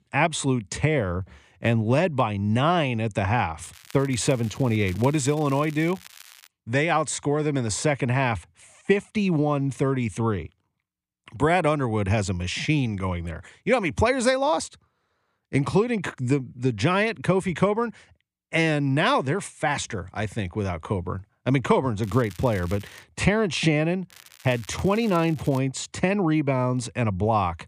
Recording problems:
crackling; faint; from 3.5 to 6.5 s, at 22 s and from 24 to 26 s; 20 dB below the speech

